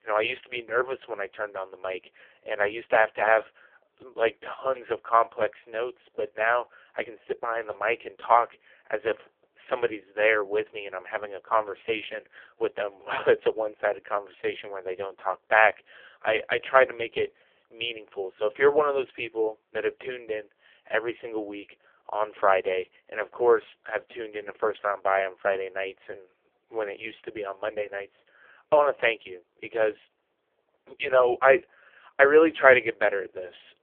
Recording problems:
phone-call audio; poor line; nothing above 3.5 kHz

